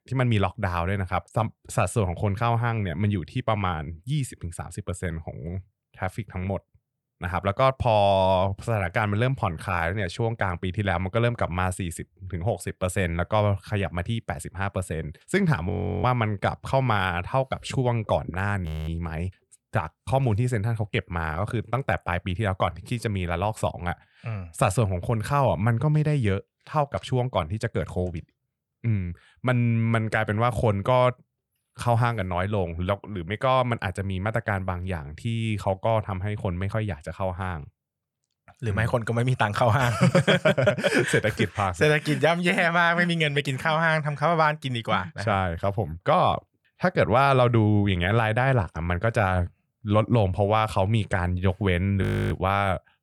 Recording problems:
audio freezing; at 16 s, at 19 s and at 52 s

